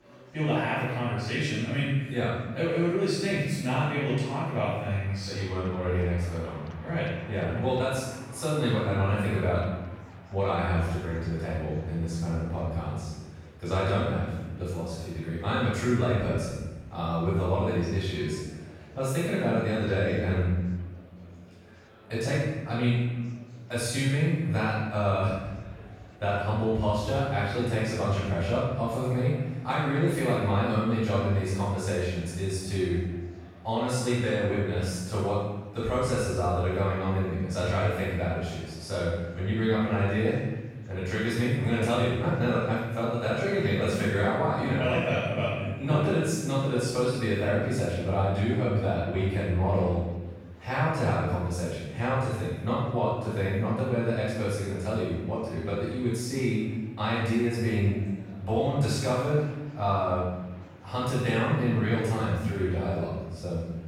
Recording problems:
room echo; strong; dies away in 1.1 s
off-mic speech; far
murmuring crowd; faint; throughout; 25 dB below the speech

